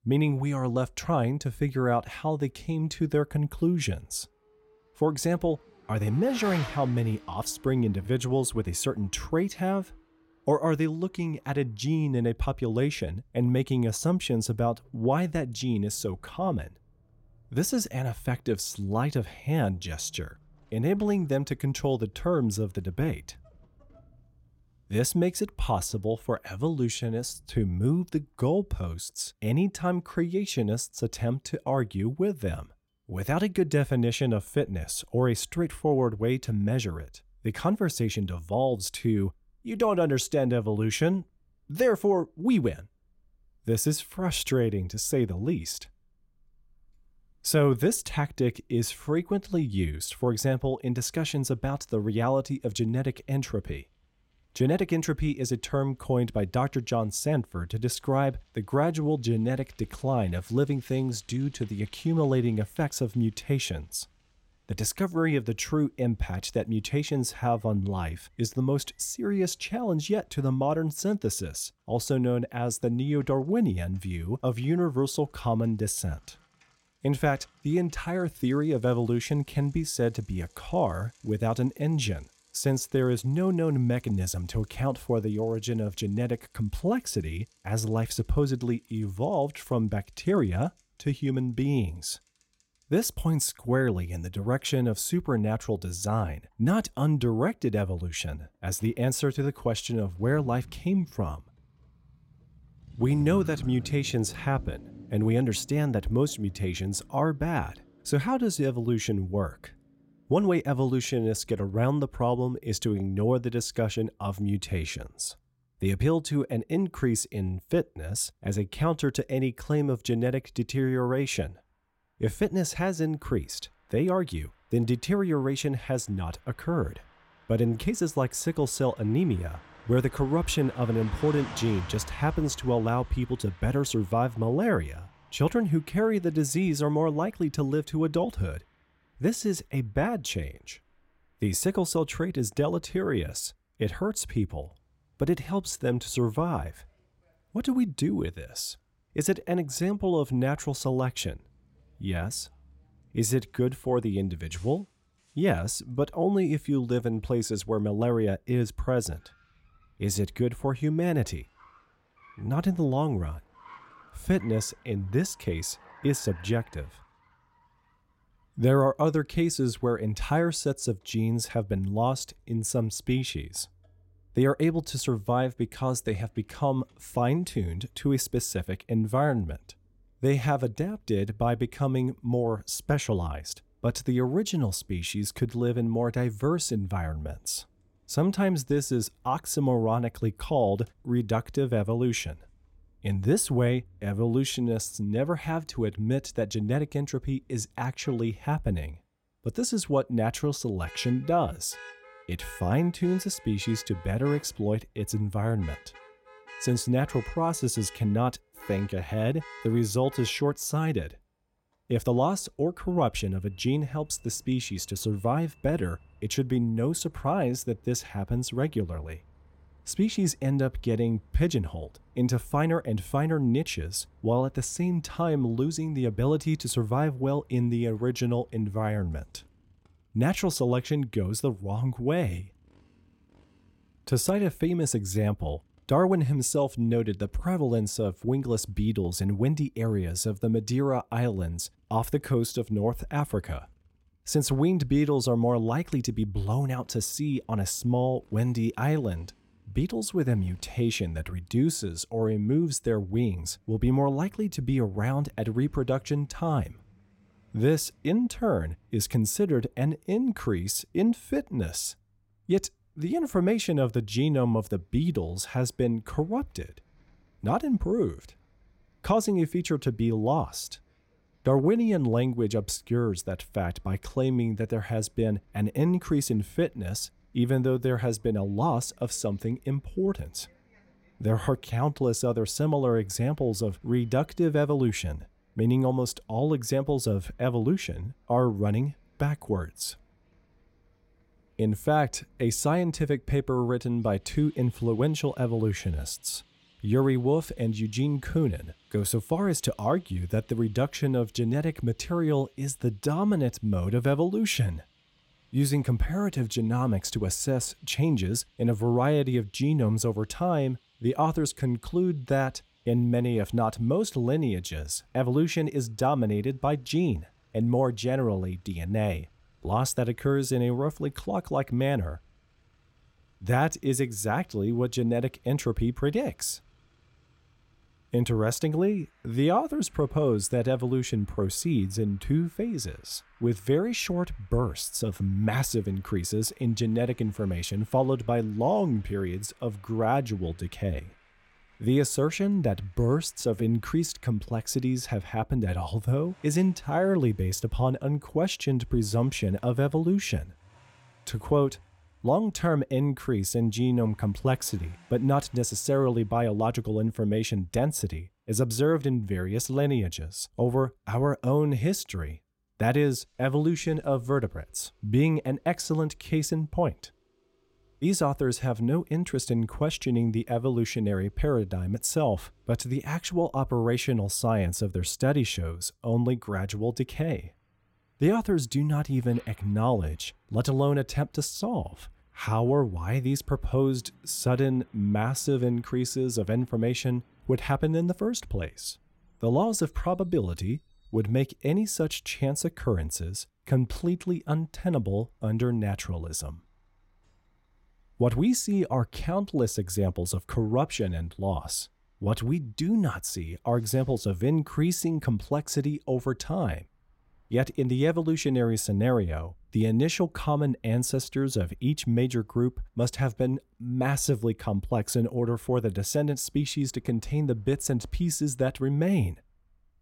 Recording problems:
traffic noise; faint; throughout; 25 dB below the speech

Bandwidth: 16.5 kHz